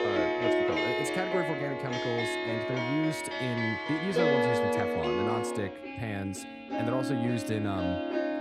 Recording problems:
background music; very loud; throughout; 4 dB above the speech

